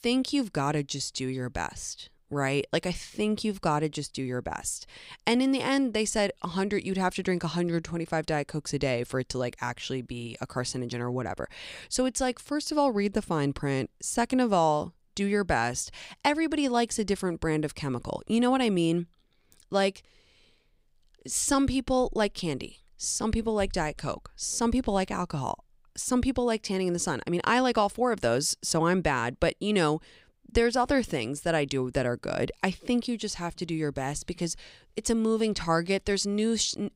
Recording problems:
none

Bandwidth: 15.5 kHz